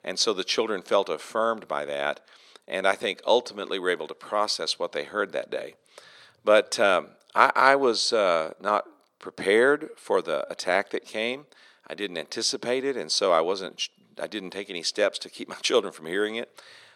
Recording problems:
thin; somewhat; fading below 300 Hz

